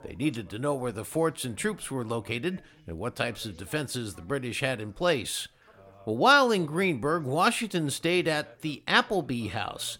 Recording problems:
background chatter; faint; throughout; 2 voices, 25 dB below the speech

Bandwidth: 17 kHz